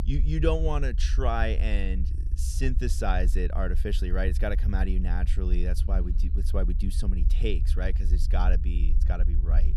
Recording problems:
low rumble; noticeable; throughout; 15 dB below the speech

